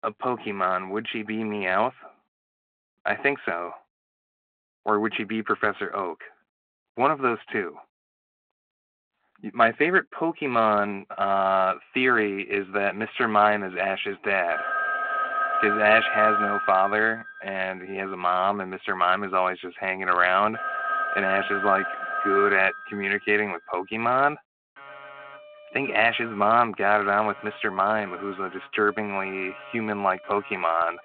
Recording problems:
phone-call audio
alarms or sirens; loud; from 12 s on; 2 dB below the speech

